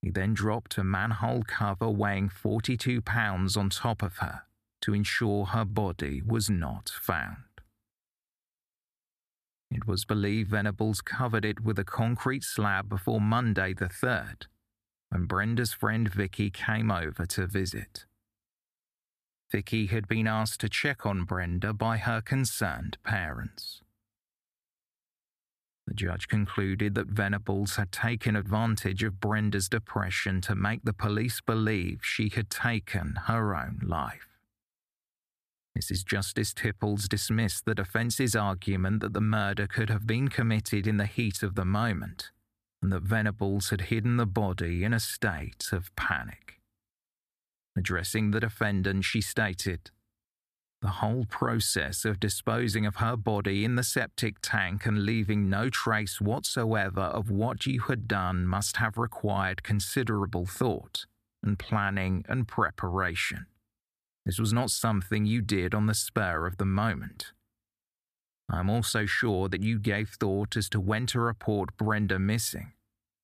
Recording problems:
none

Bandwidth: 14.5 kHz